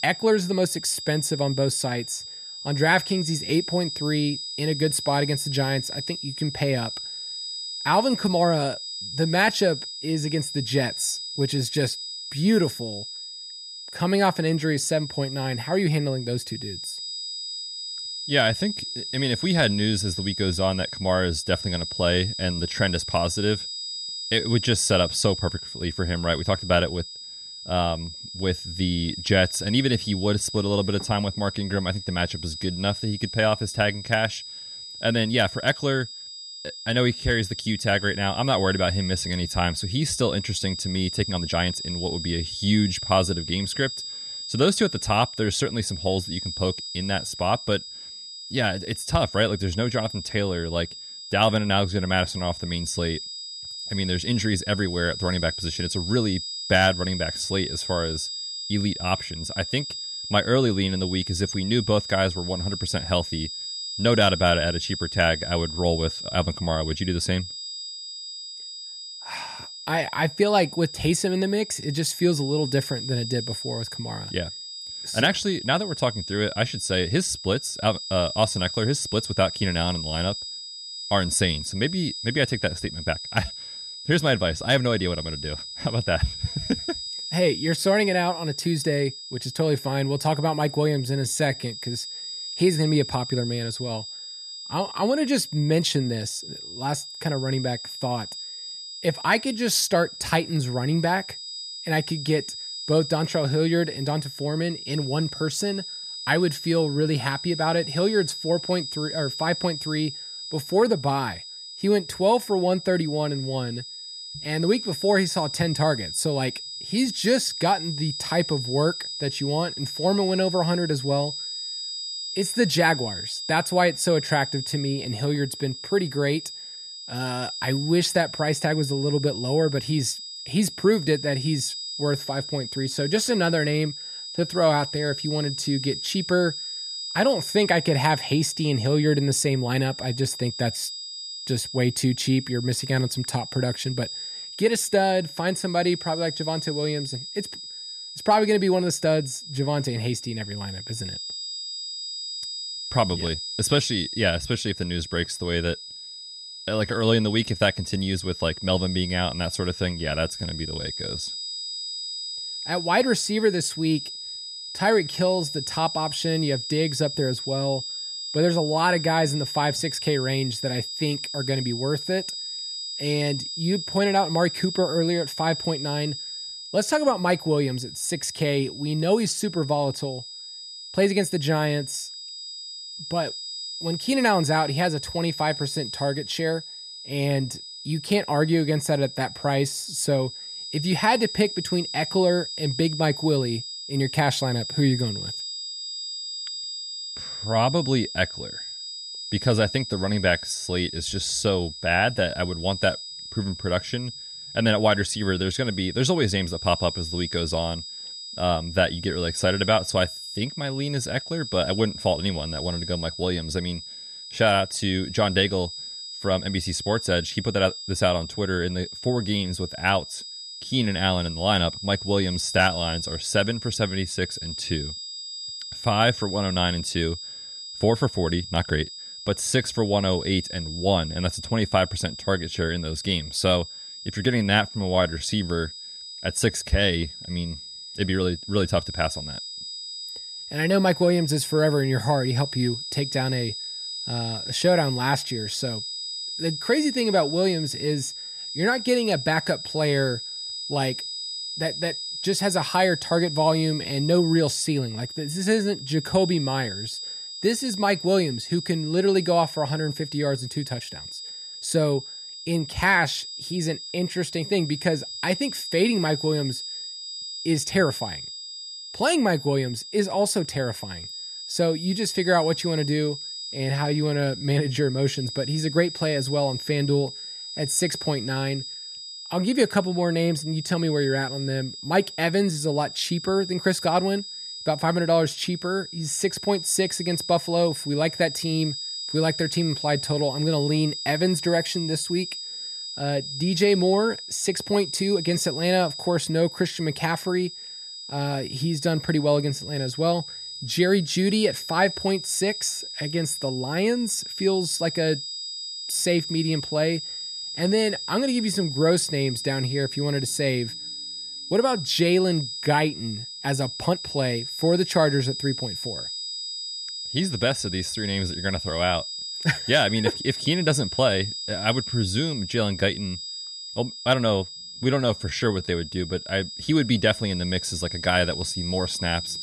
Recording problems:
high-pitched whine; loud; throughout; 5 kHz, 8 dB below the speech
uneven, jittery; strongly; from 11 s to 5:26

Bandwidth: 13.5 kHz